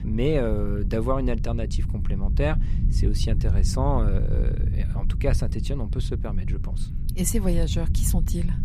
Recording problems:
low rumble; noticeable; throughout; 10 dB below the speech

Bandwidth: 14.5 kHz